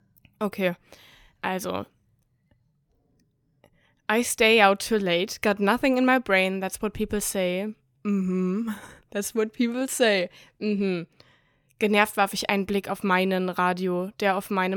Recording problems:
abrupt cut into speech; at the end

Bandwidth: 18 kHz